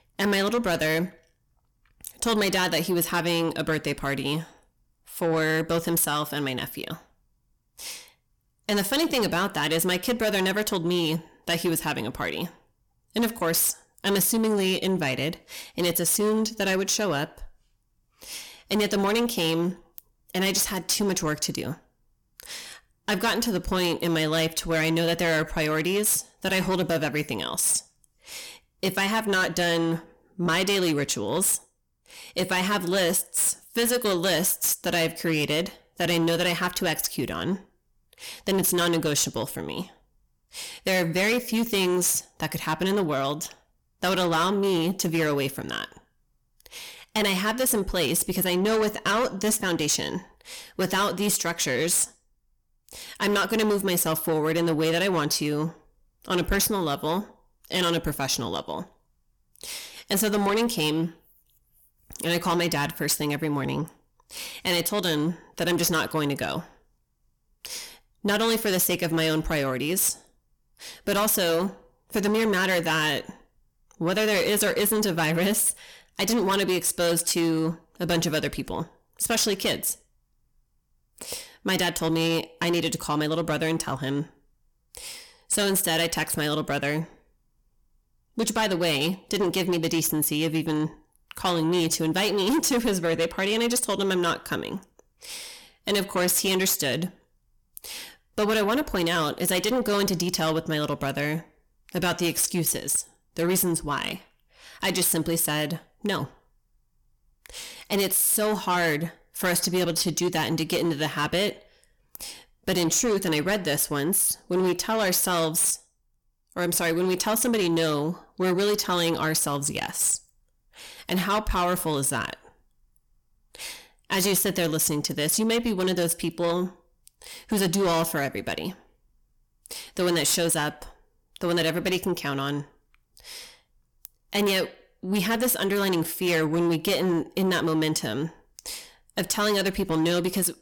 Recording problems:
distortion; heavy; 8 dB below the speech

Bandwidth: 18 kHz